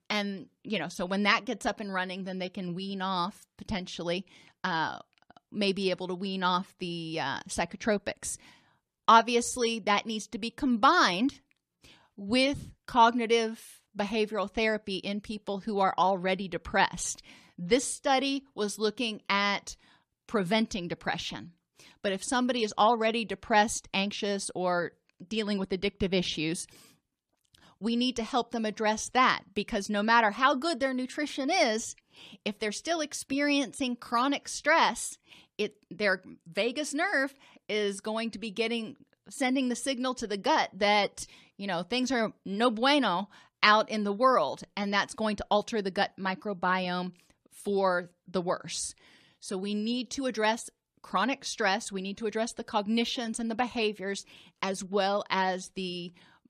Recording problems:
none

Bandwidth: 14.5 kHz